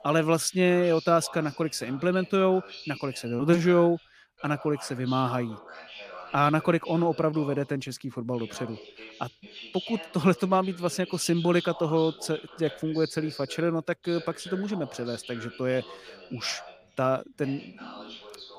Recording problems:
voice in the background; noticeable; throughout; 15 dB below the speech

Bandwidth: 15 kHz